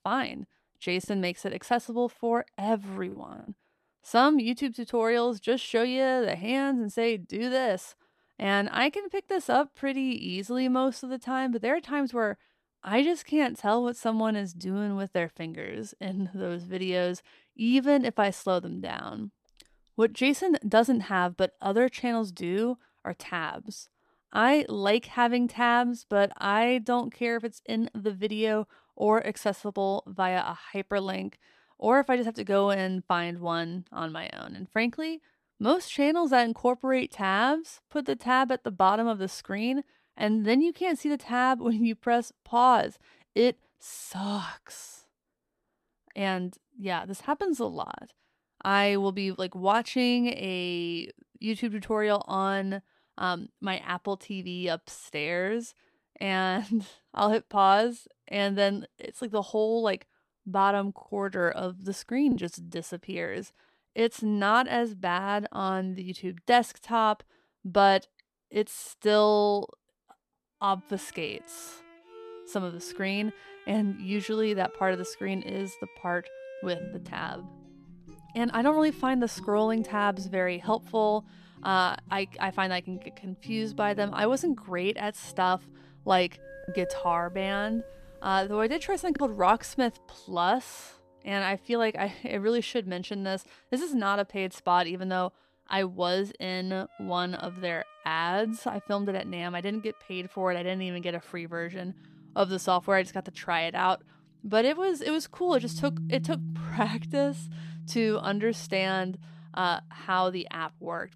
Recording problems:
background music; noticeable; from 1:11 on; 15 dB below the speech
choppy; occasionally; from 1 to 3.5 s, at 1:02 and from 1:27 to 1:29; 3% of the speech affected

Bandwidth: 14 kHz